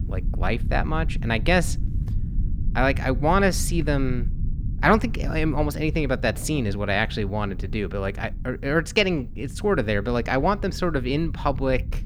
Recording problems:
rain or running water; faint; throughout; 25 dB below the speech
low rumble; faint; throughout; 20 dB below the speech

